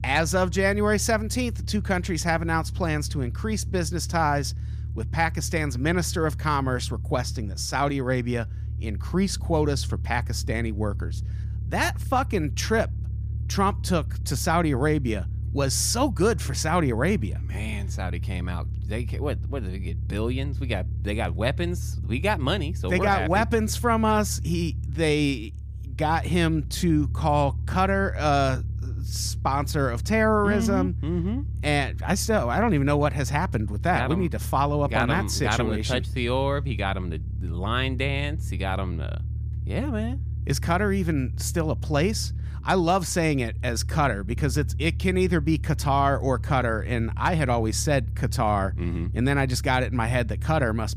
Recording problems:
low rumble; faint; throughout; 20 dB below the speech

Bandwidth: 15 kHz